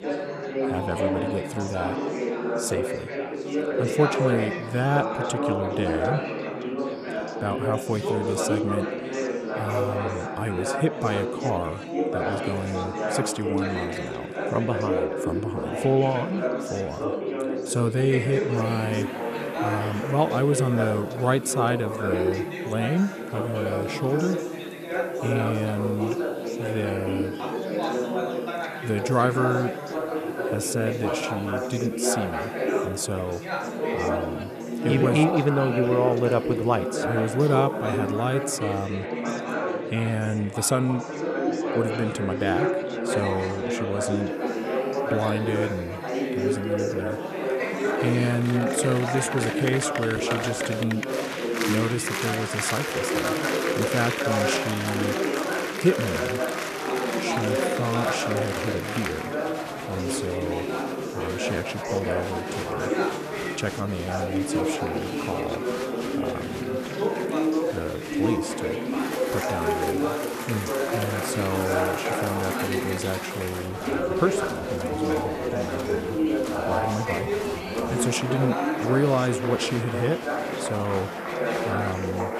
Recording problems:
chatter from many people; very loud; throughout; as loud as the speech
hiss; faint; from 19 to 39 s and from 44 s on; 25 dB below the speech

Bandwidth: 14 kHz